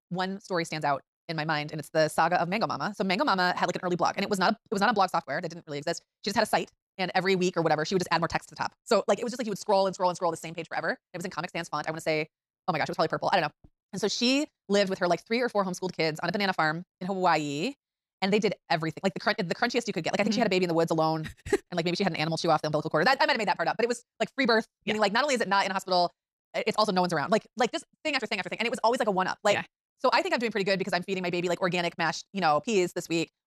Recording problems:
wrong speed, natural pitch; too fast; 1.7 times normal speed

